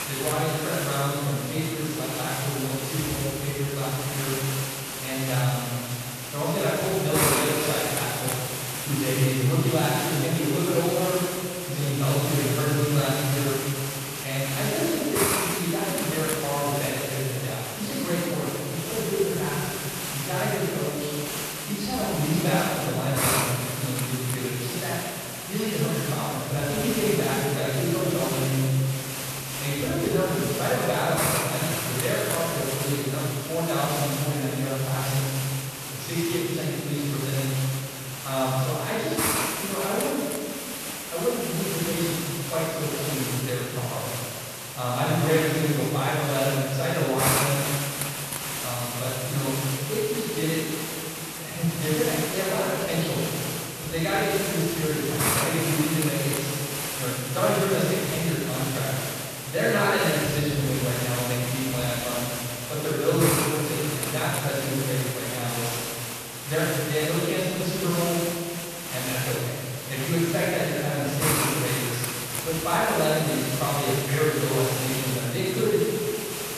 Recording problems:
room echo; strong; dies away in 1.9 s
off-mic speech; far
hiss; loud; throughout; 3 dB below the speech

